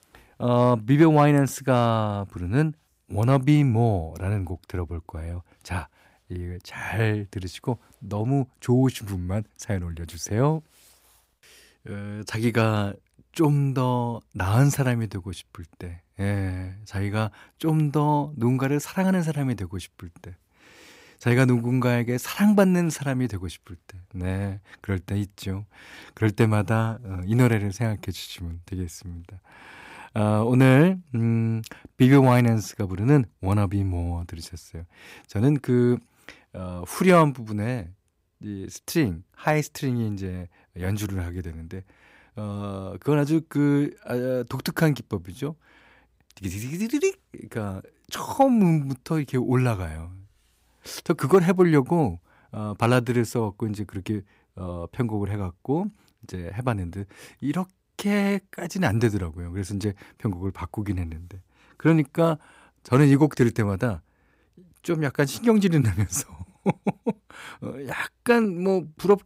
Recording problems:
none

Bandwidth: 15.5 kHz